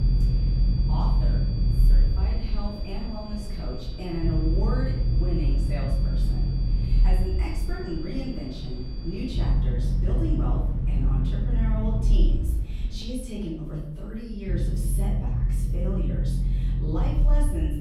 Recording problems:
off-mic speech; far
room echo; noticeable; dies away in 0.8 s
low rumble; loud; throughout; 4 dB below the speech
high-pitched whine; noticeable; until 9.5 s; 4.5 kHz, 10 dB below the speech

